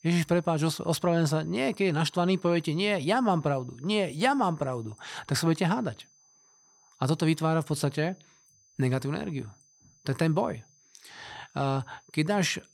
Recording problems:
high-pitched whine; faint; throughout; 6 kHz, 30 dB below the speech

